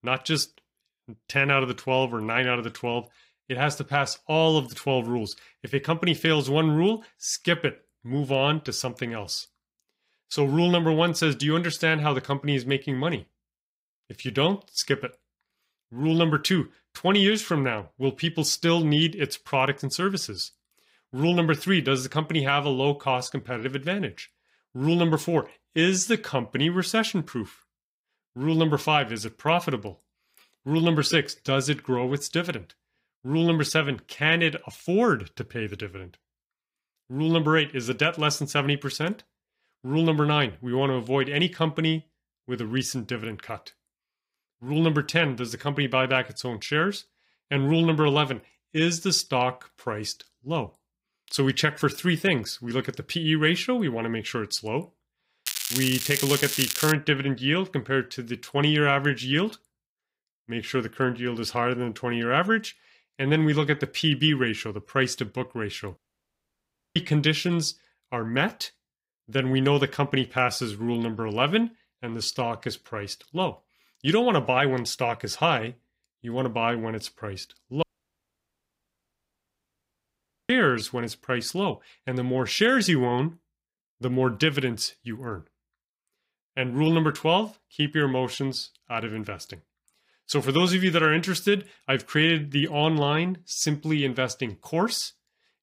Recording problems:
crackling; loud; from 55 to 57 s; 2 dB below the speech
audio cutting out; at 1:06 for 1 s and at 1:18 for 2.5 s

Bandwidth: 15.5 kHz